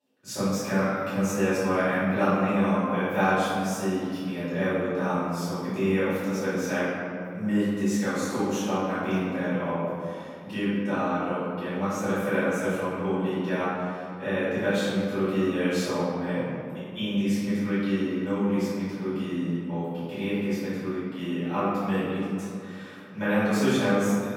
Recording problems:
room echo; strong; dies away in 2.1 s
off-mic speech; far

